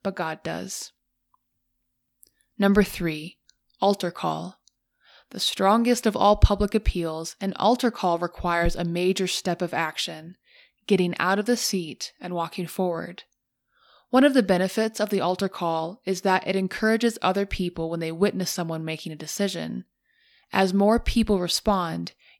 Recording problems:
none

